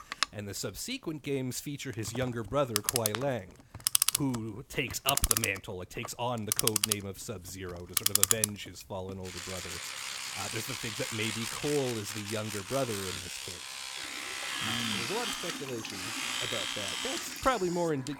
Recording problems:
household noises; very loud; throughout; 4 dB above the speech

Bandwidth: 17 kHz